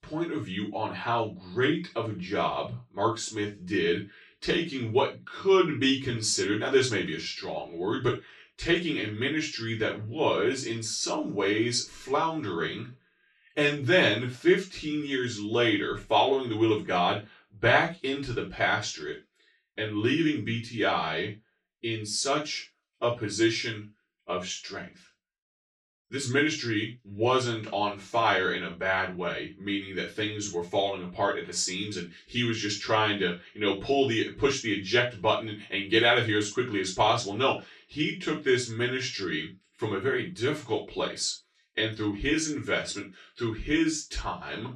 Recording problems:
off-mic speech; far
room echo; slight; dies away in 0.2 s

